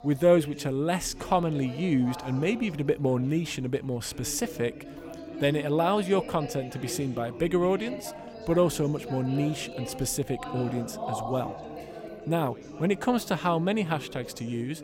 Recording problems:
chatter from many people; noticeable; throughout; 10 dB below the speech

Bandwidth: 16 kHz